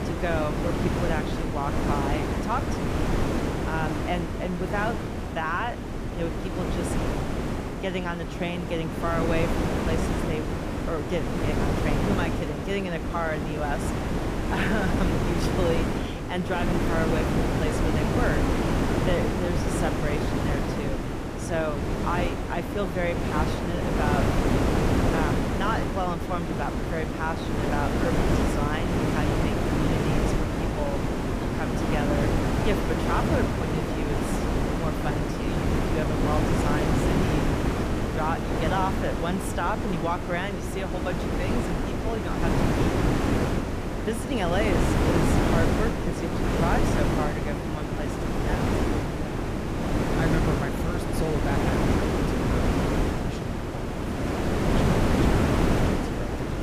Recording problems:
wind noise on the microphone; heavy; 2 dB above the speech

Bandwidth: 15 kHz